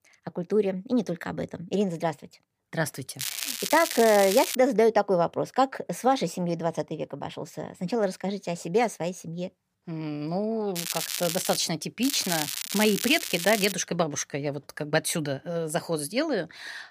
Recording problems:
crackling; loud; from 3 to 4.5 s, at 11 s and from 12 to 14 s; 4 dB below the speech

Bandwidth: 15 kHz